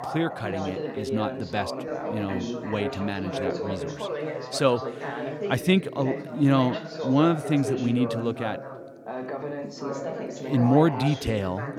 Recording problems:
background chatter; loud; throughout; 3 voices, 6 dB below the speech

